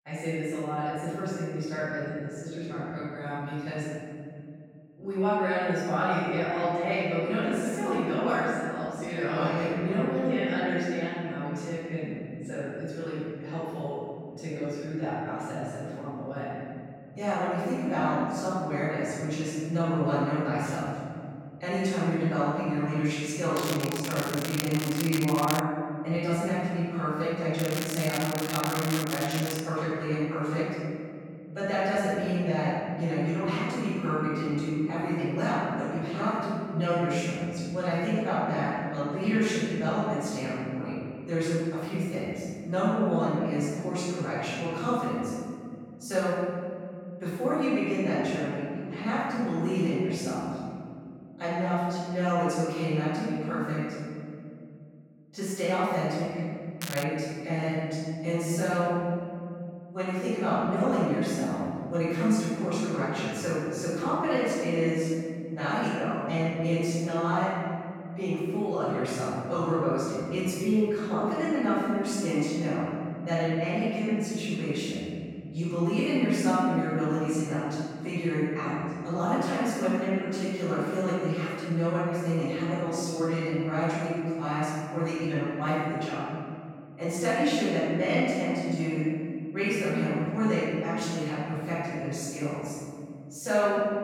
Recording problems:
room echo; strong; dies away in 2.6 s
off-mic speech; far
crackling; loud; from 24 to 26 s, from 28 to 30 s and at 57 s; 6 dB below the speech

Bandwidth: 17 kHz